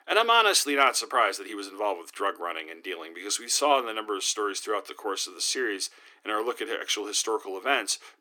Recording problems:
thin; somewhat; fading below 300 Hz

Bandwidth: 17.5 kHz